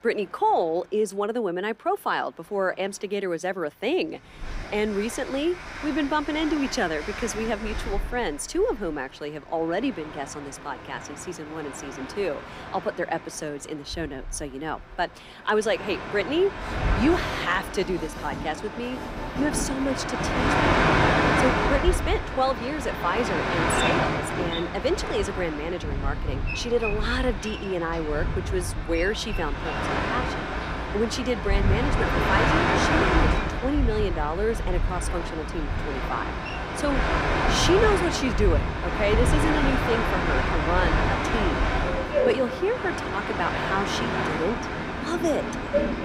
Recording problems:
train or aircraft noise; very loud; throughout; 1 dB above the speech

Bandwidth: 15.5 kHz